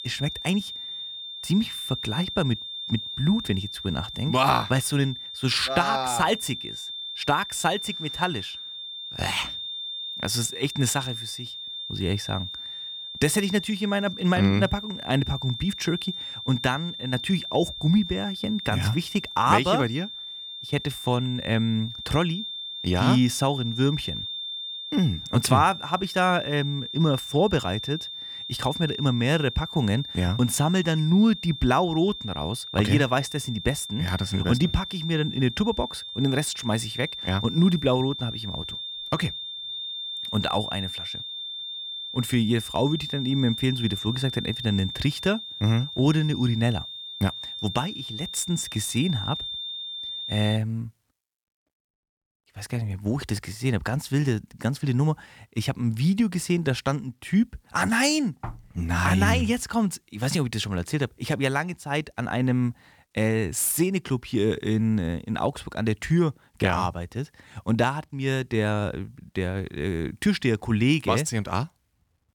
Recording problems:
high-pitched whine; loud; until 51 s; 3.5 kHz, 7 dB below the speech

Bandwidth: 18.5 kHz